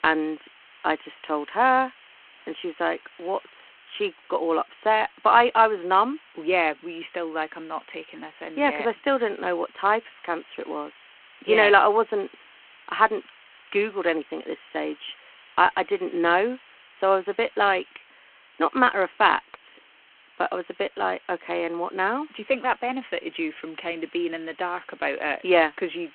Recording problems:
phone-call audio
hiss; faint; throughout; 25 dB below the speech

